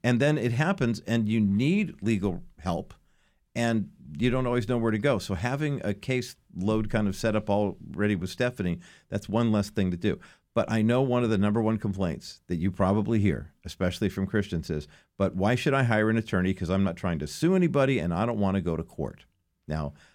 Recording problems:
none

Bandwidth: 17.5 kHz